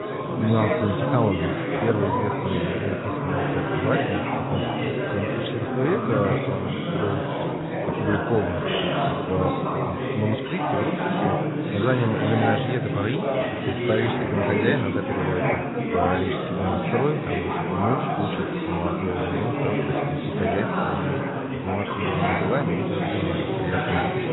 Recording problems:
garbled, watery; badly; nothing above 4 kHz
chatter from many people; very loud; throughout; 3 dB above the speech

